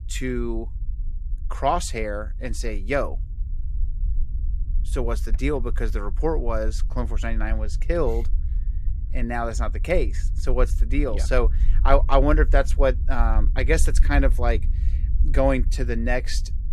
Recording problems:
low rumble; faint; throughout; 20 dB below the speech

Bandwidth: 14.5 kHz